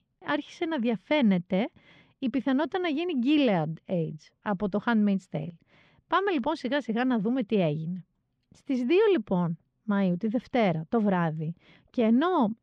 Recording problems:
muffled; very slightly; fading above 4 kHz

